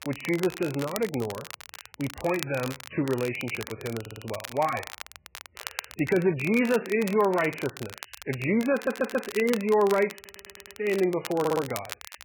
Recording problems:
garbled, watery; badly; nothing above 2.5 kHz
crackle, like an old record; noticeable; 15 dB below the speech
audio stuttering; 4 times, first at 4 s

